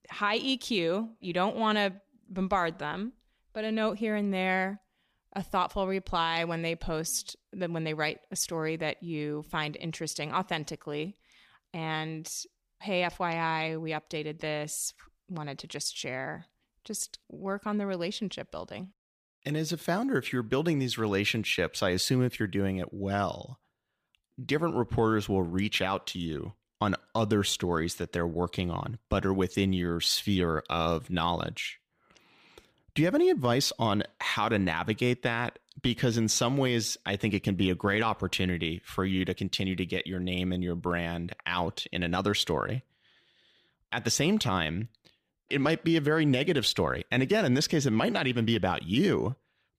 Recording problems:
none

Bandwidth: 15 kHz